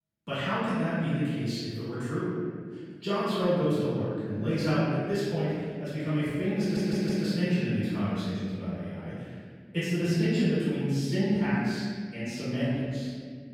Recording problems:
room echo; strong; dies away in 2.1 s
off-mic speech; far
audio stuttering; at 6.5 s

